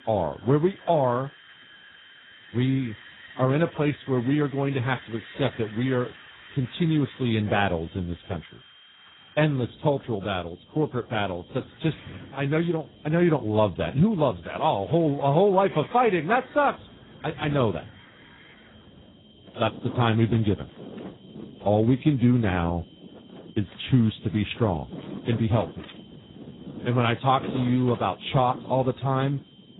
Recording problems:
garbled, watery; badly; nothing above 4 kHz
wind in the background; noticeable; throughout; 20 dB below the speech
high-pitched whine; faint; throughout; 3 kHz, 25 dB below the speech

